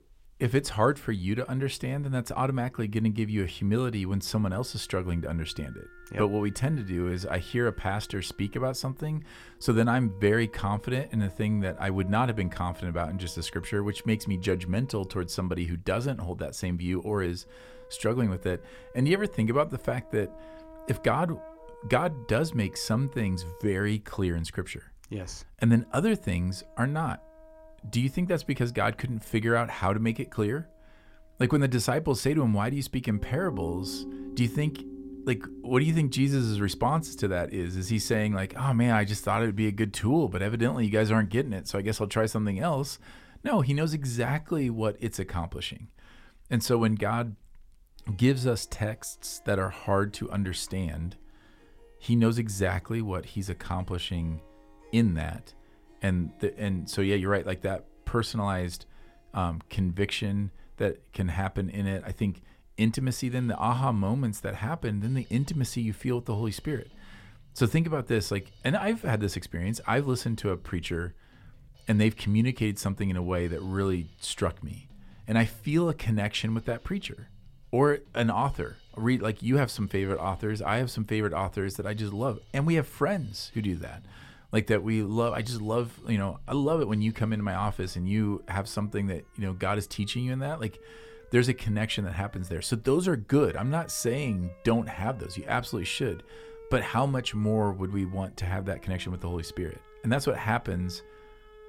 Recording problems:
background music; faint; throughout; 20 dB below the speech

